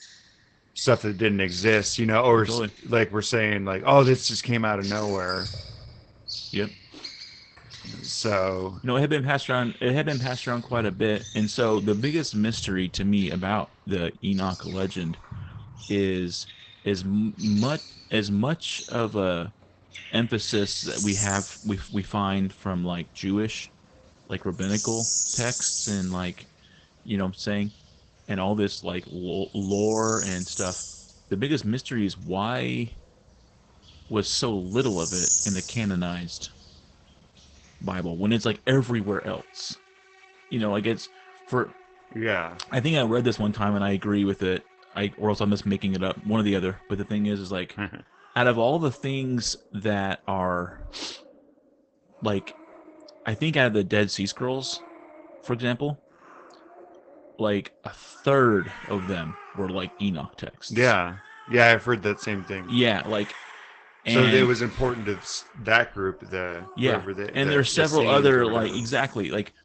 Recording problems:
garbled, watery; badly; nothing above 8 kHz
animal sounds; loud; throughout; 8 dB below the speech

